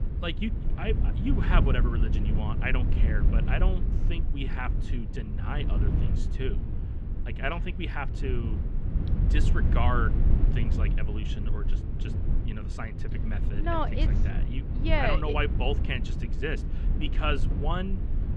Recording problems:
muffled; slightly; fading above 3 kHz
low rumble; loud; throughout; 9 dB below the speech

